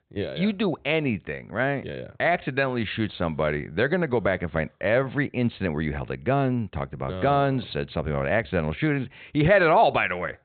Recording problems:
high frequencies cut off; severe; nothing above 4 kHz

